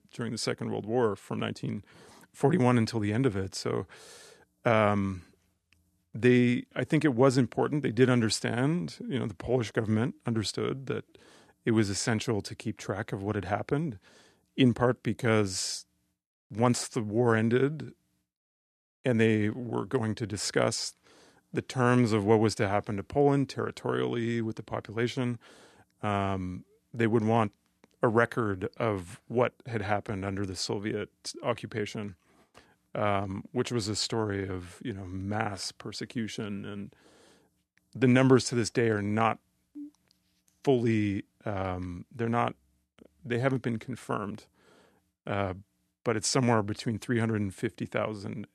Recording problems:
none

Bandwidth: 13.5 kHz